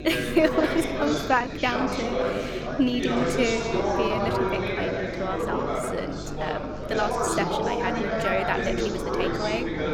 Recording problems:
chatter from many people; very loud; throughout; 1 dB above the speech
electrical hum; noticeable; throughout; 50 Hz, 15 dB below the speech
uneven, jittery; strongly; from 0.5 to 9 s

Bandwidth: 18 kHz